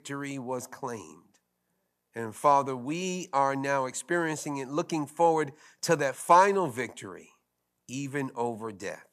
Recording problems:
none

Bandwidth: 14.5 kHz